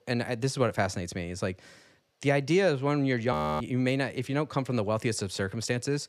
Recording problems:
audio freezing; at 3.5 s

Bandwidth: 14.5 kHz